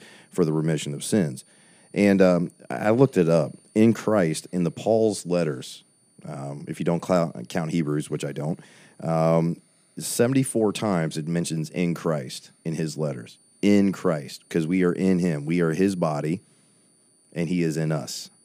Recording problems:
high-pitched whine; faint; throughout; 9.5 kHz, 35 dB below the speech

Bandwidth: 15 kHz